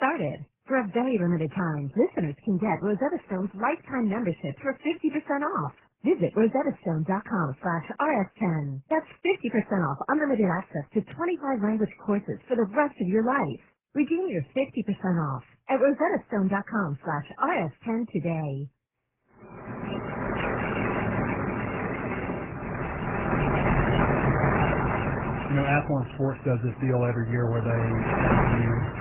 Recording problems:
garbled, watery; badly; nothing above 3 kHz
muffled; very slightly; fading above 4 kHz
rain or running water; loud; from 20 s on; 1 dB below the speech
abrupt cut into speech; at the start

